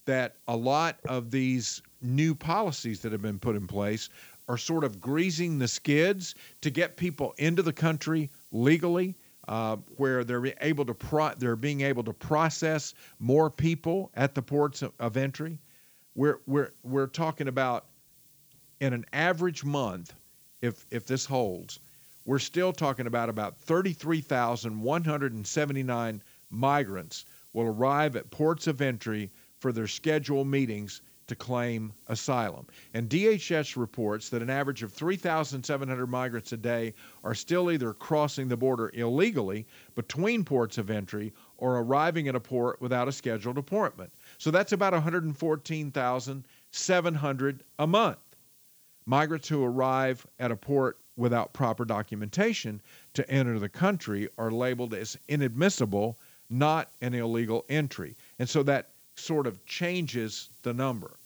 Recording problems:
high frequencies cut off; noticeable; nothing above 7.5 kHz
hiss; faint; throughout; 25 dB below the speech

